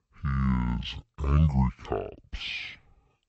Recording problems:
wrong speed and pitch; too slow and too low; 0.5 times normal speed

